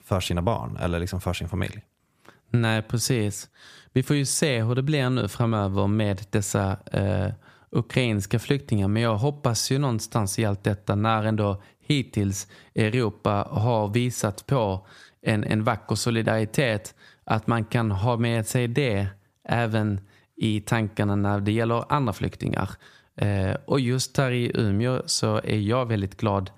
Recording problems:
squashed, flat; somewhat

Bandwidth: 15 kHz